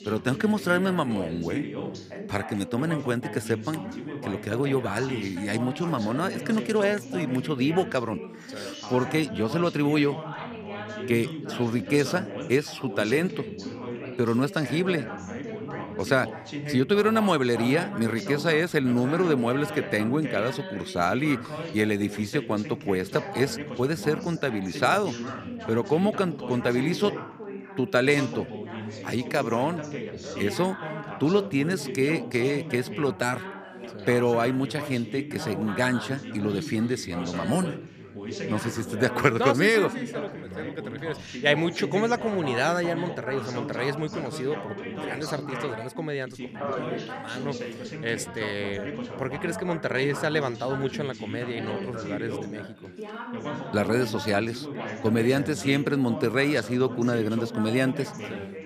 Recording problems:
background chatter; loud; throughout; 3 voices, 9 dB below the speech

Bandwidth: 14.5 kHz